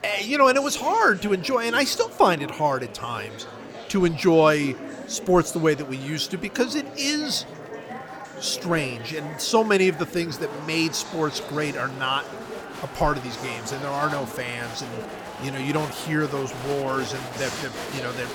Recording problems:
murmuring crowd; noticeable; throughout; 10 dB below the speech

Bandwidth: 18.5 kHz